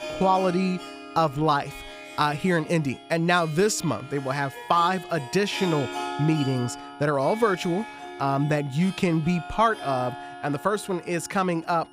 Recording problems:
background music; noticeable; throughout; 15 dB below the speech
high-pitched whine; faint; throughout; 3 kHz, 35 dB below the speech

